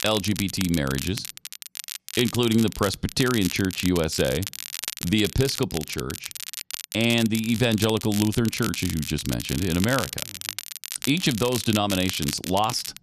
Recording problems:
crackle, like an old record; loud; 8 dB below the speech

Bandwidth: 14 kHz